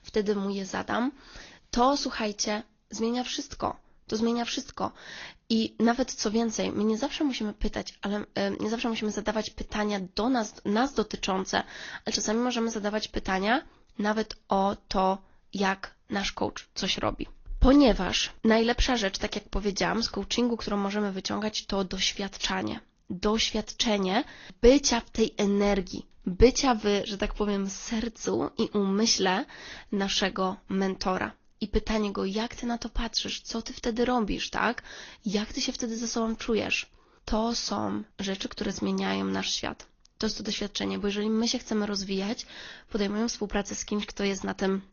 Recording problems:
high frequencies cut off; noticeable; nothing above 6.5 kHz
garbled, watery; slightly

